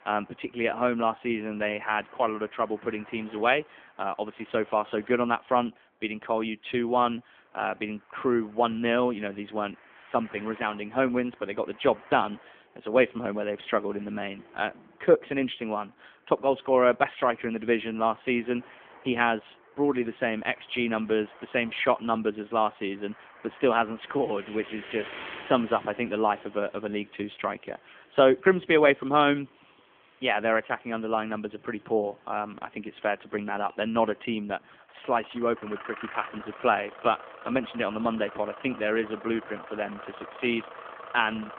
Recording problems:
phone-call audio; nothing above 3.5 kHz
traffic noise; noticeable; throughout; 20 dB below the speech

